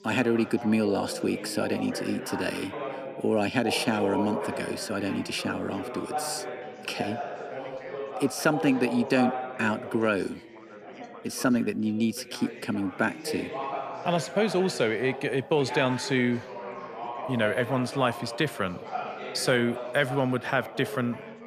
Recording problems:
background chatter; loud; throughout; 4 voices, 8 dB below the speech

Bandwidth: 14.5 kHz